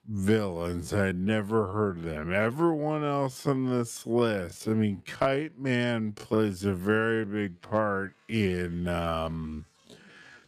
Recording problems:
wrong speed, natural pitch; too slow; 0.5 times normal speed

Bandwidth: 14.5 kHz